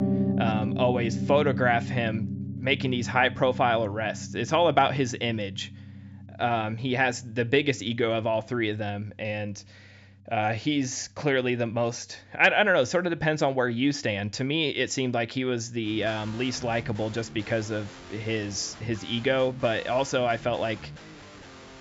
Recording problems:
high frequencies cut off; noticeable; nothing above 8 kHz
background music; loud; throughout; 9 dB below the speech

